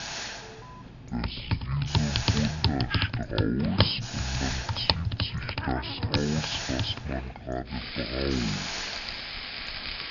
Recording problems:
wrong speed and pitch; too slow and too low; 0.5 times normal speed
high frequencies cut off; noticeable; nothing above 5.5 kHz
household noises; very loud; throughout; as loud as the speech
hiss; loud; throughout; 4 dB below the speech
animal sounds; noticeable; from 3 s on; 15 dB below the speech
alarm; faint; at 0.5 s; peak 15 dB below the speech

